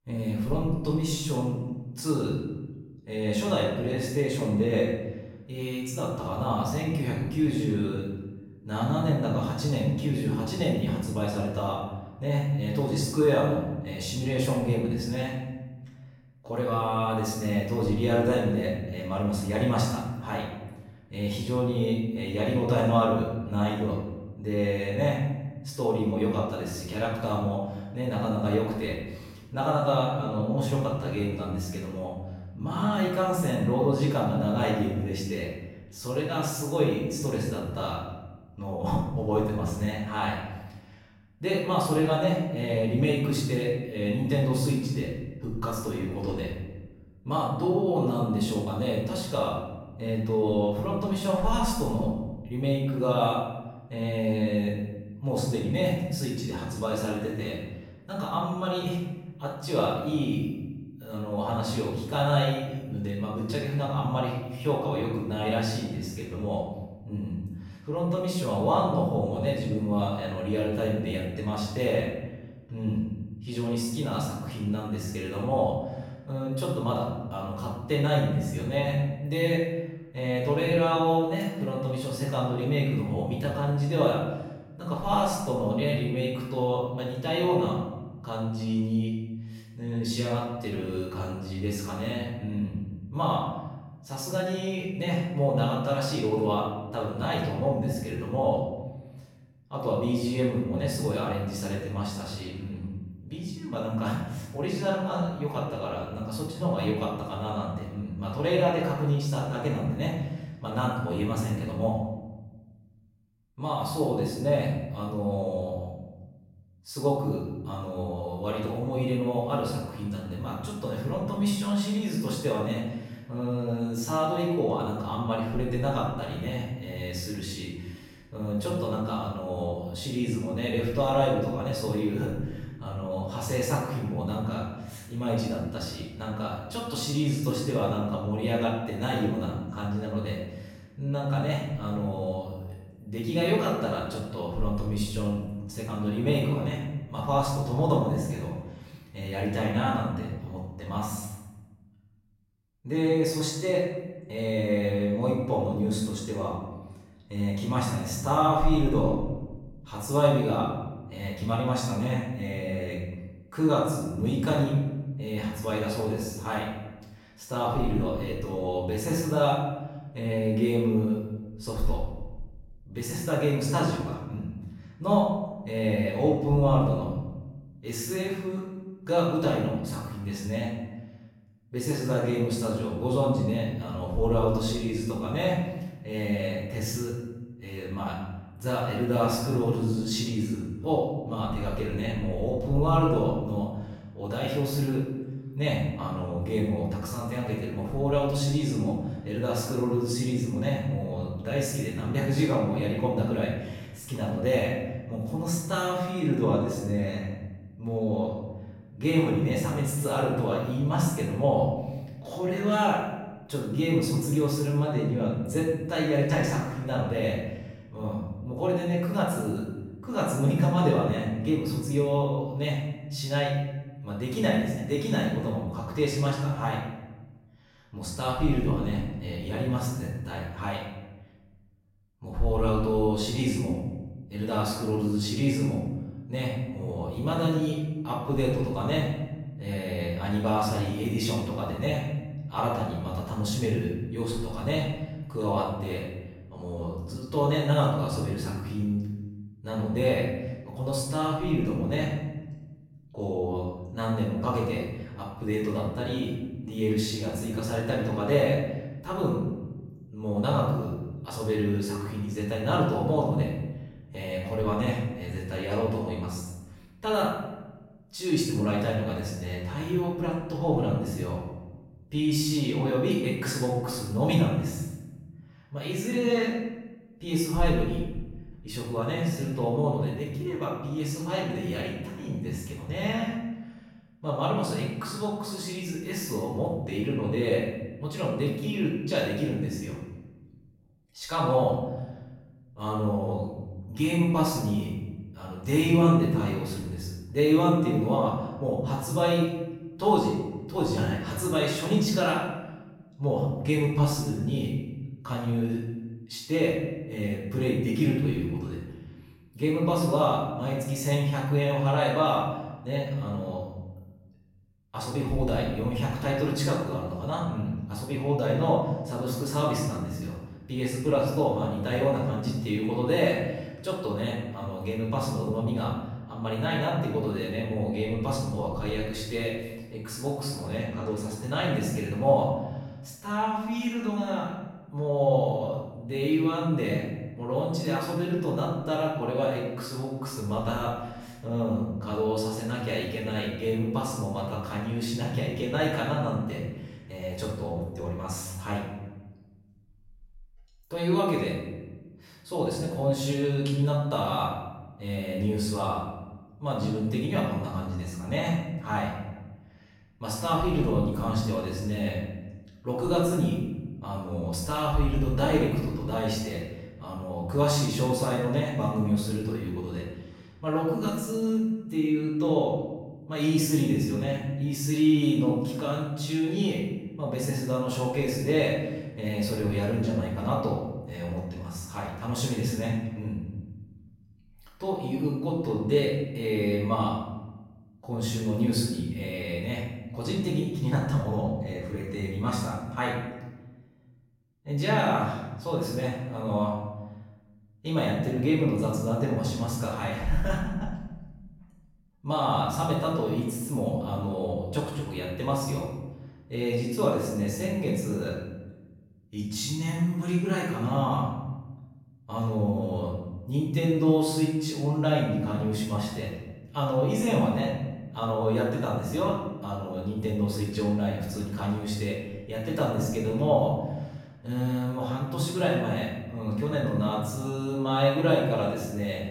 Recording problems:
off-mic speech; far
room echo; noticeable; dies away in 1.1 s

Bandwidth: 16 kHz